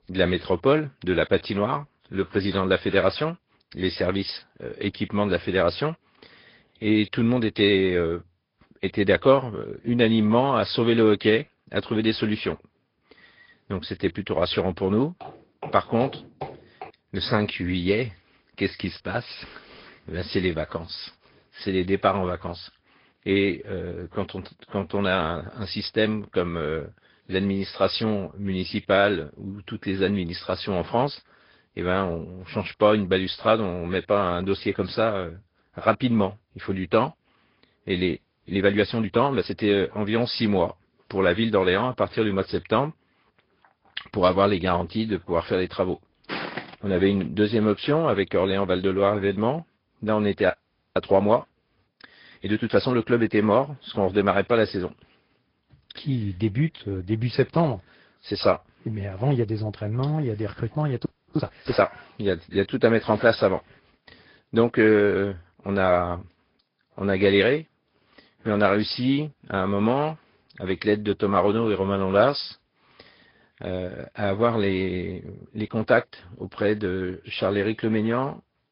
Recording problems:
high frequencies cut off; noticeable; nothing above 5 kHz
garbled, watery; slightly
footsteps; faint; from 15 to 17 s; peak 10 dB below the speech
audio freezing; at 38 s, at 51 s and at 1:01
footsteps; noticeable; at 46 s; peak 6 dB below the speech

